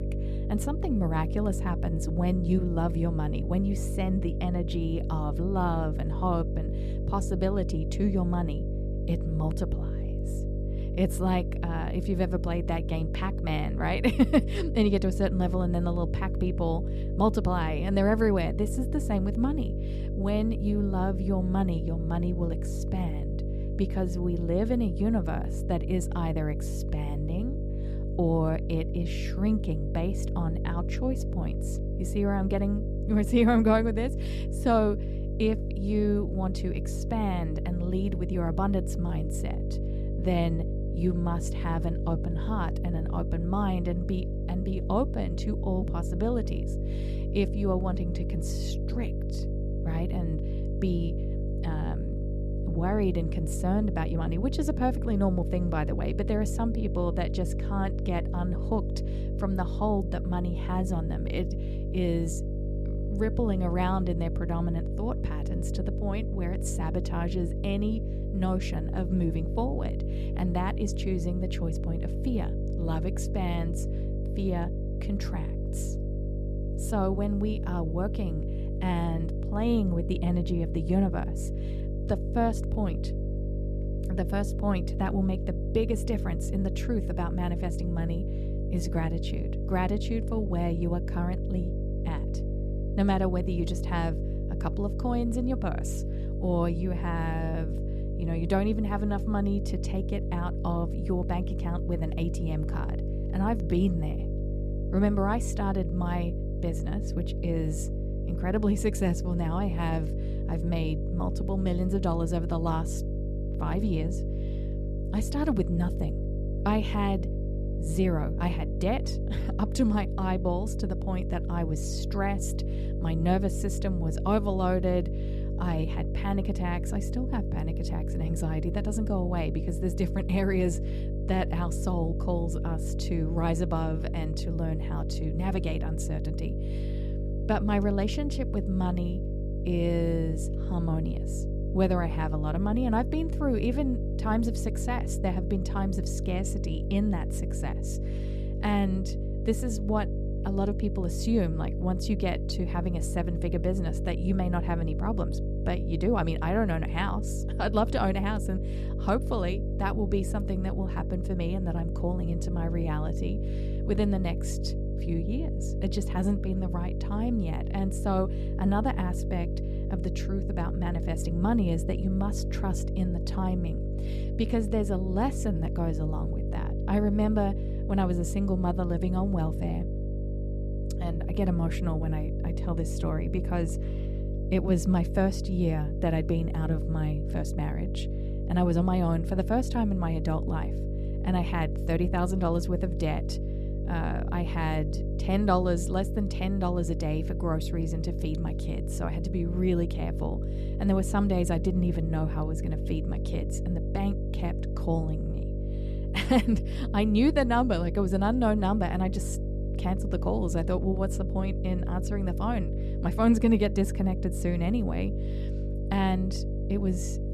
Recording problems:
electrical hum; loud; throughout; 50 Hz, 8 dB below the speech

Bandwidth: 14.5 kHz